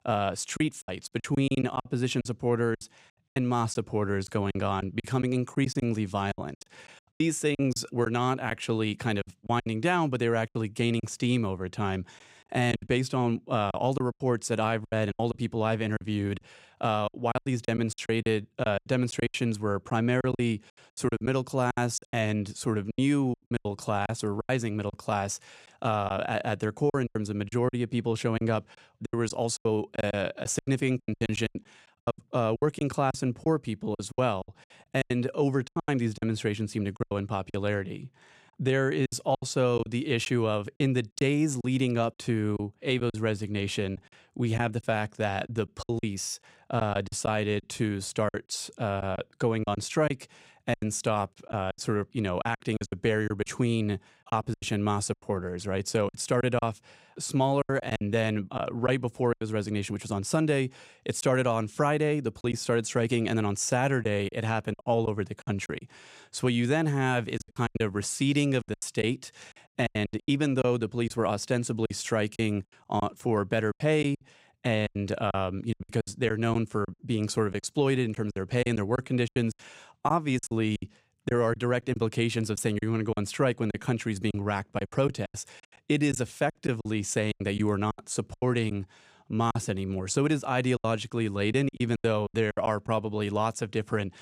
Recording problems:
choppy; very; 11% of the speech affected

